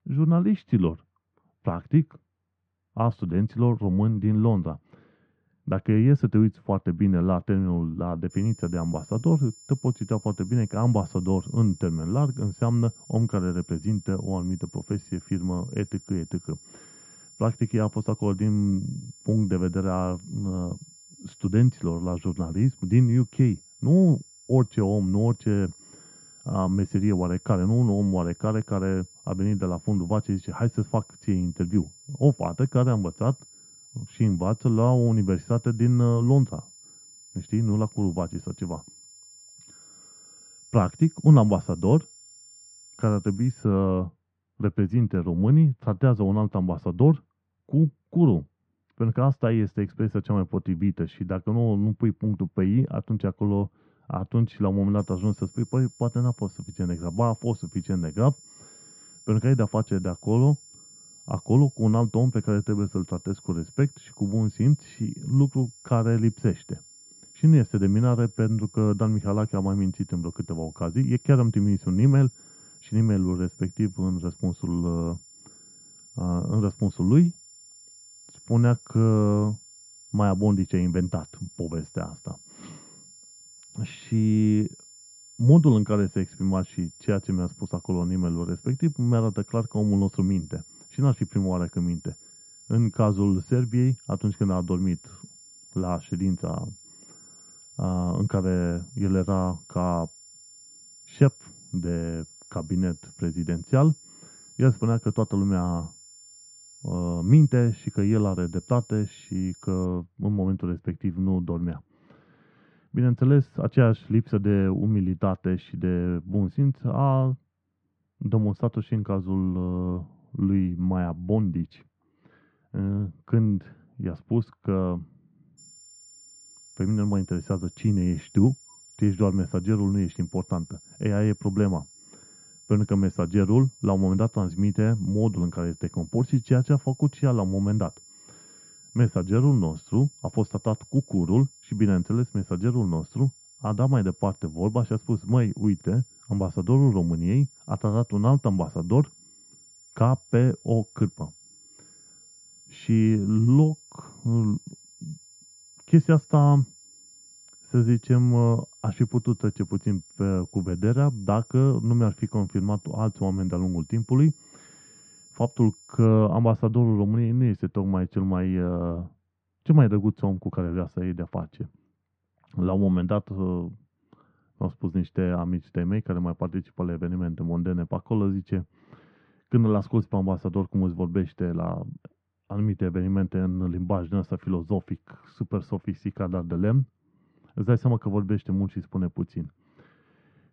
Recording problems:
muffled; very; fading above 1.5 kHz
high-pitched whine; faint; from 8.5 to 44 s, from 55 s to 1:50 and from 2:06 to 2:46; 7 kHz, 25 dB below the speech

